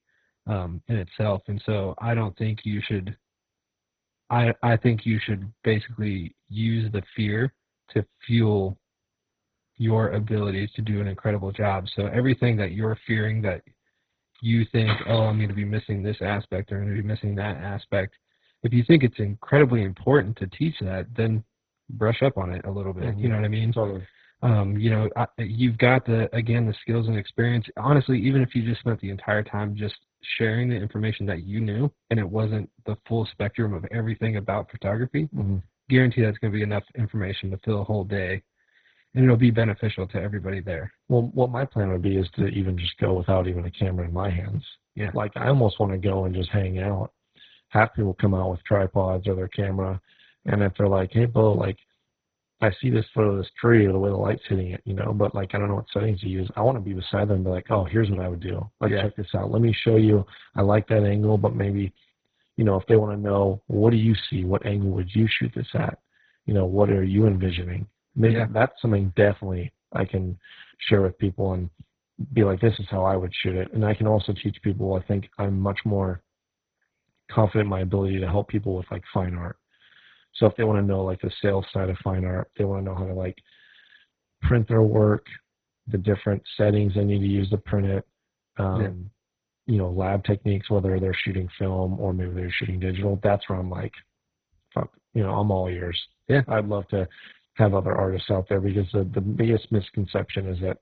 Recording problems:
garbled, watery; badly; nothing above 4 kHz
jangling keys; noticeable; at 15 s; peak 6 dB below the speech

